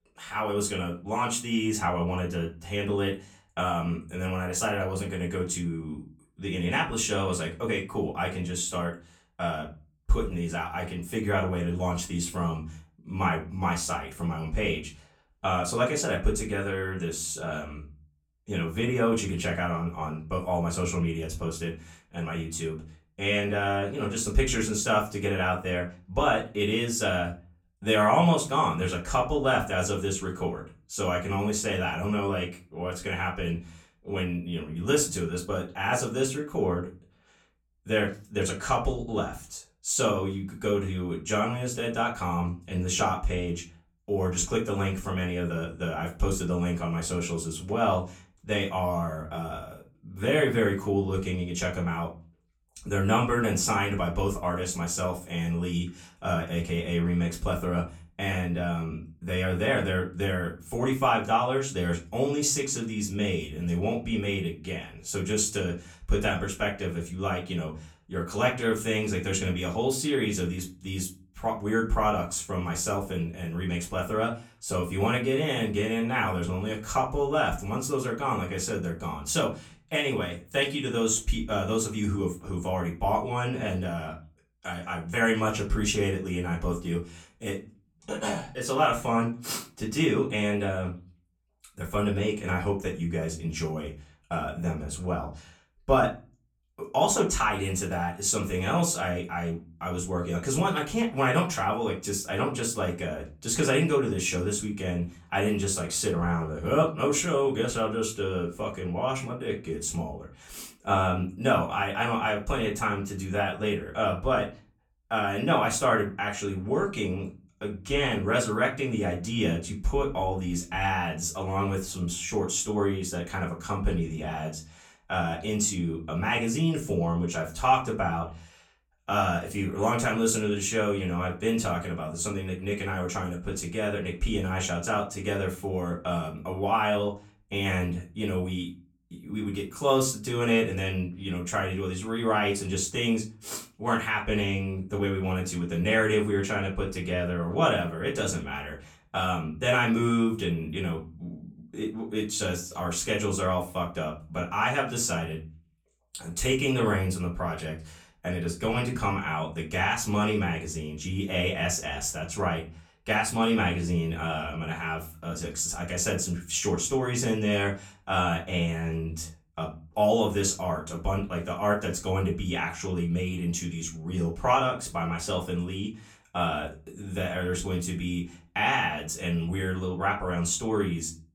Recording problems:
off-mic speech; far
room echo; very slight; dies away in 0.3 s

